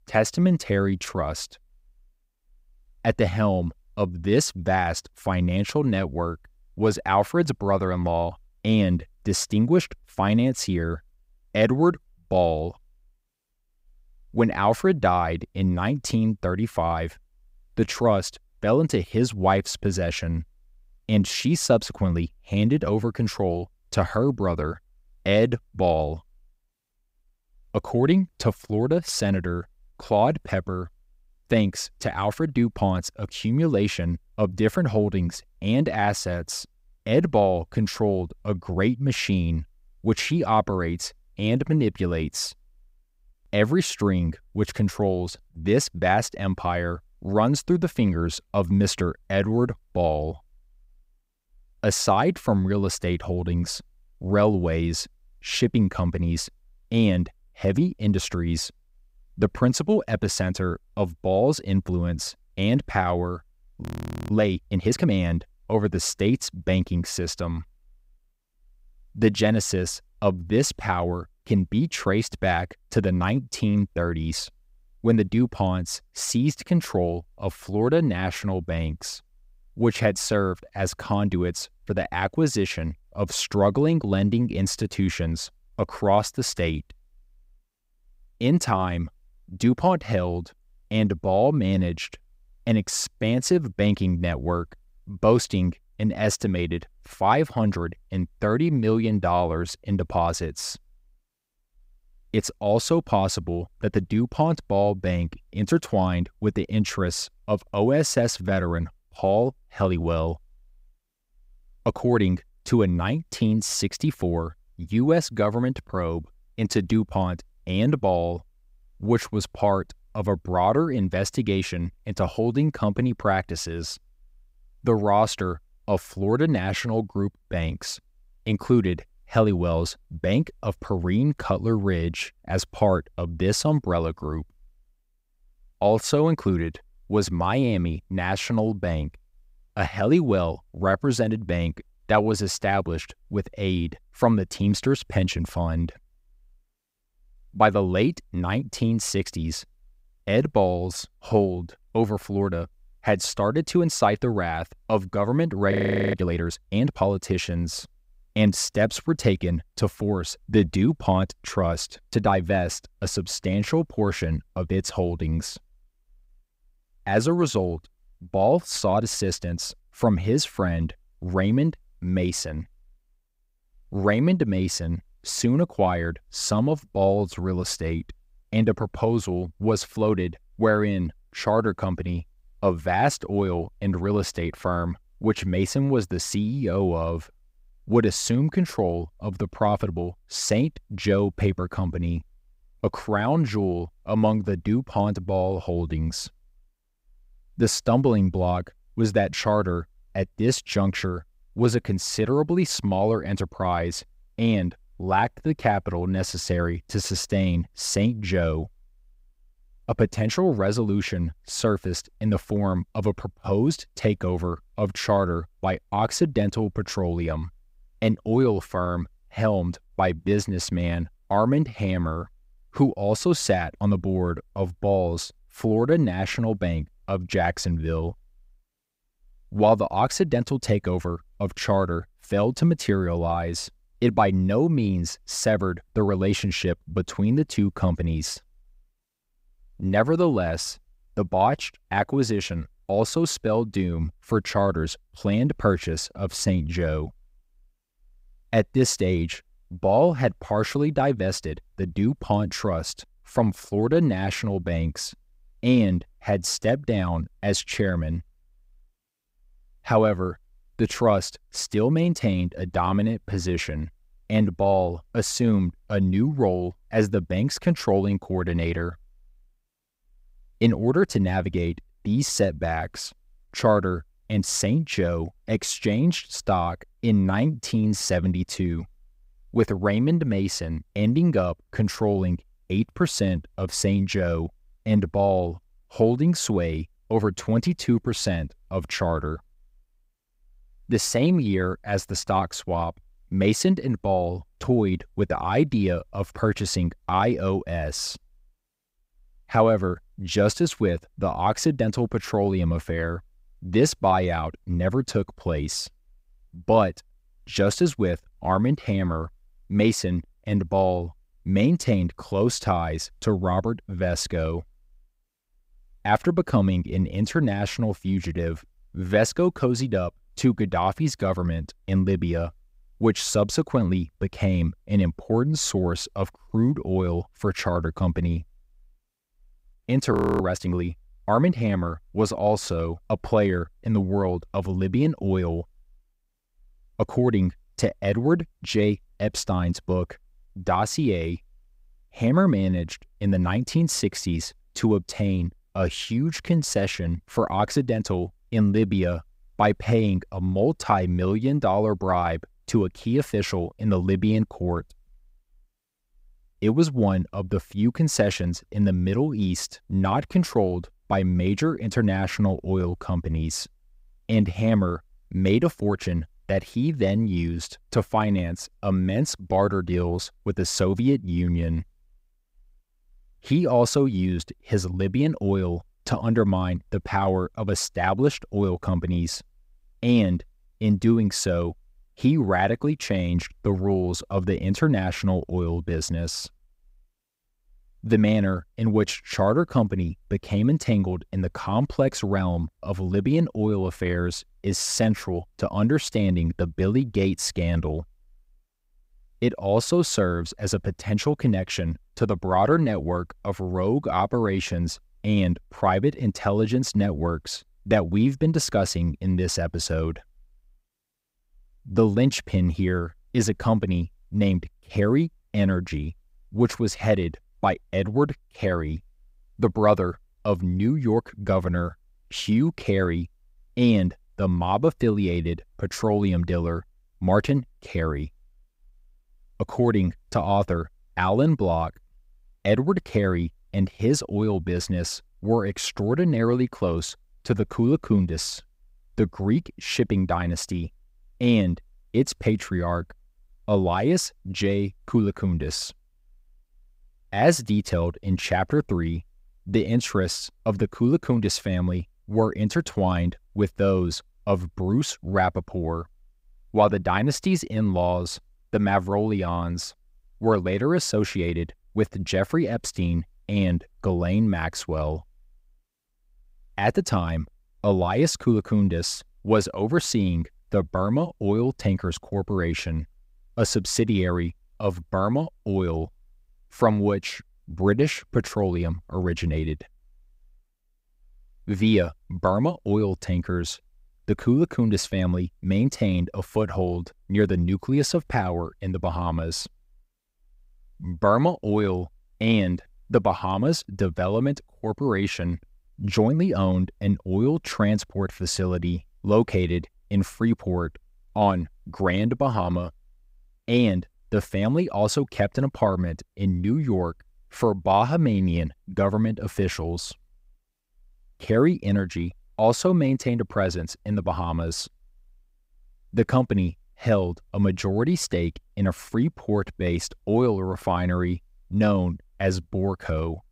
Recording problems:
audio freezing; at 1:04, at 2:36 and at 5:30

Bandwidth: 15.5 kHz